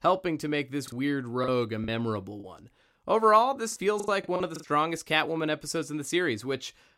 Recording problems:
choppy; very; from 1 to 2.5 s and at 3.5 s; 12% of the speech affected

